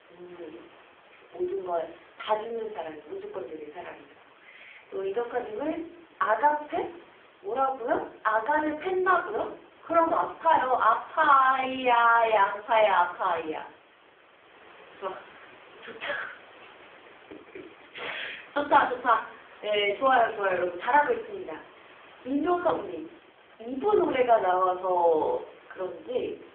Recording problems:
phone-call audio; poor line; nothing above 3.5 kHz
off-mic speech; far
room echo; slight; dies away in 0.5 s
hiss; faint; throughout; 25 dB below the speech

